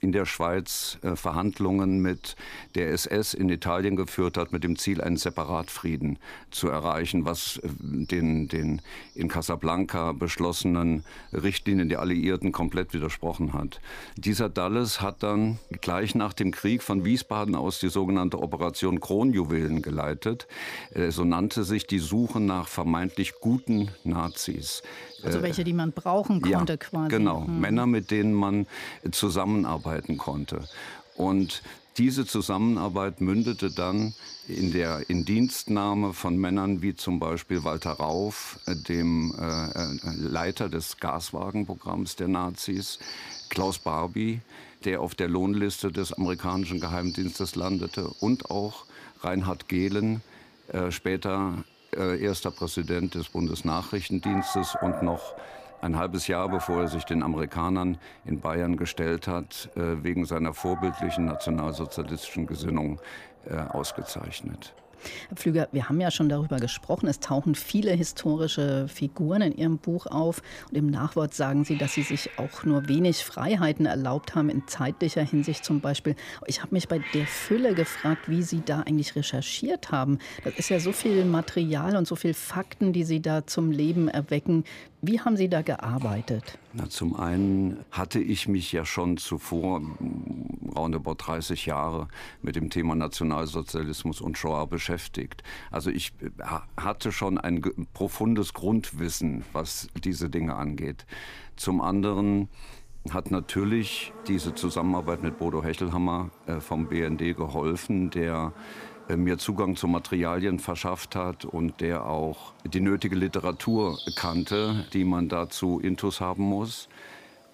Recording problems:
animal sounds; noticeable; throughout; 15 dB below the speech

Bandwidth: 15 kHz